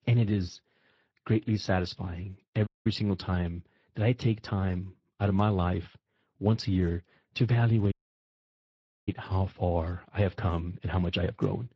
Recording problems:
garbled, watery; slightly
audio cutting out; at 2.5 s and at 8 s for 1 s

